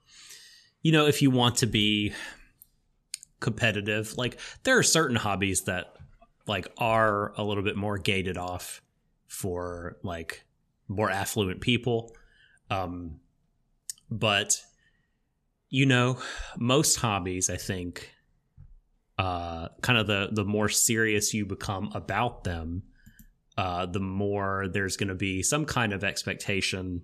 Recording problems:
none

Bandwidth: 13.5 kHz